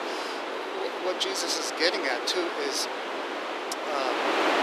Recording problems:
thin; very; fading below 300 Hz
wind noise on the microphone; heavy; as loud as the speech

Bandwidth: 14.5 kHz